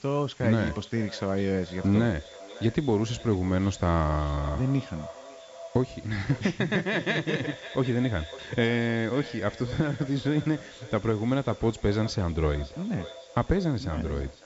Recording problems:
echo of what is said; noticeable; throughout; 550 ms later, 15 dB below the speech
high frequencies cut off; noticeable; nothing above 8 kHz
hiss; faint; throughout; 25 dB below the speech

